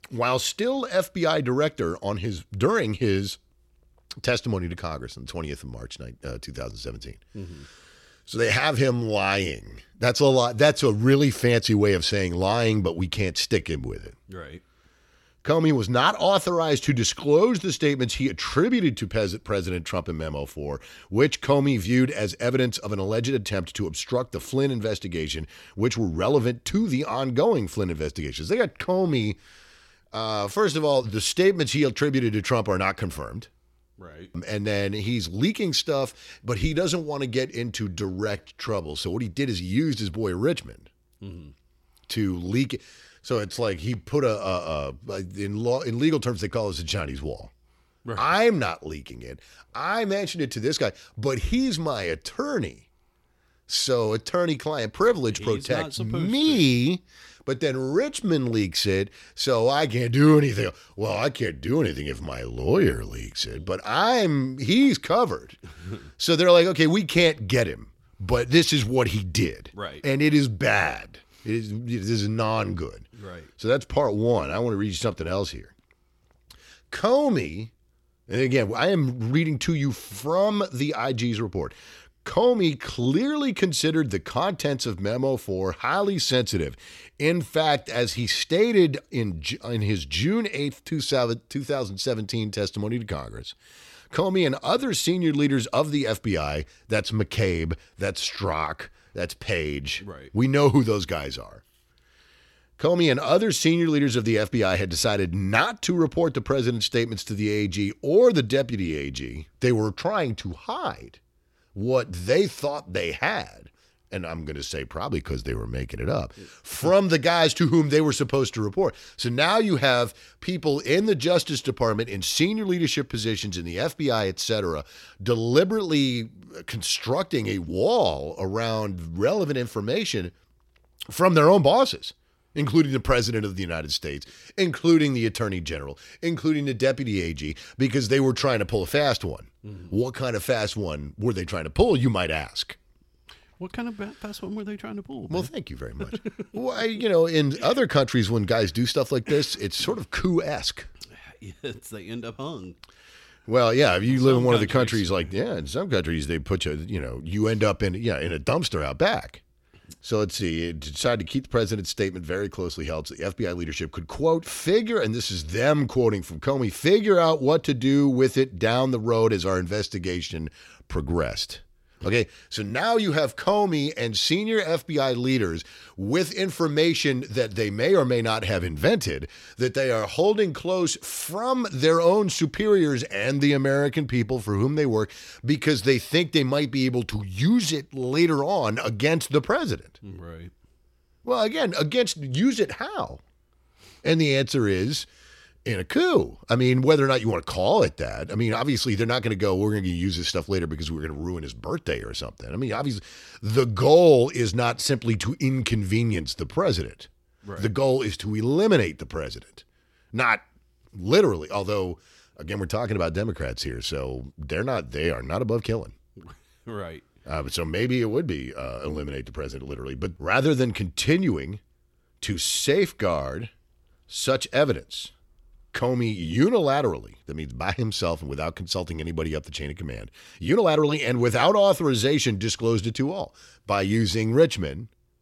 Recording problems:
uneven, jittery; strongly; from 13 s to 3:51

